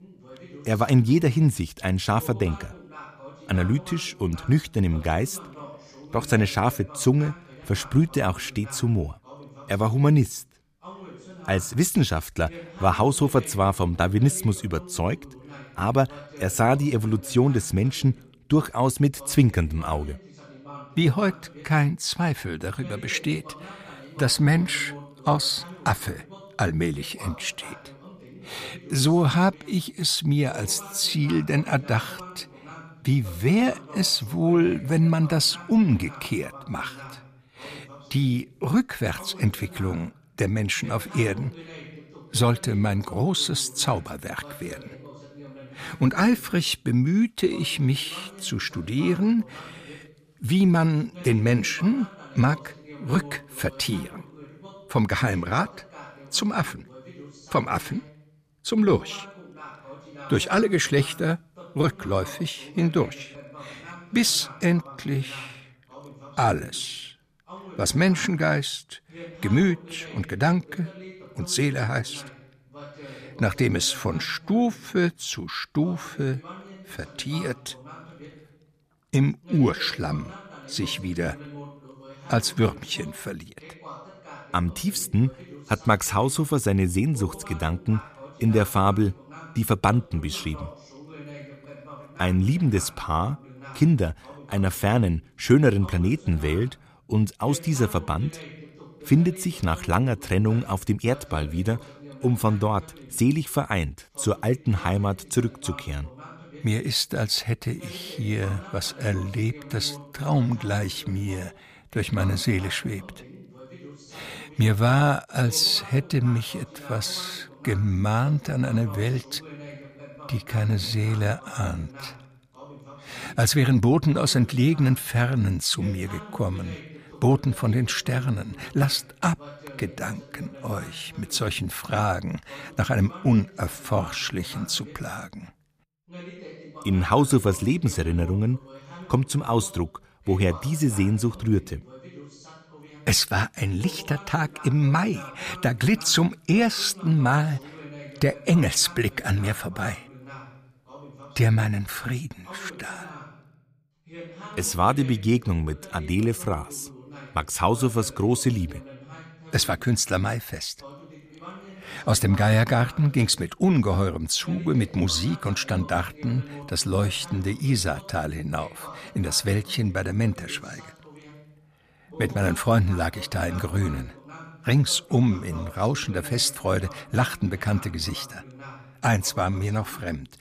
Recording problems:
voice in the background; noticeable; throughout; 20 dB below the speech

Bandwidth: 15 kHz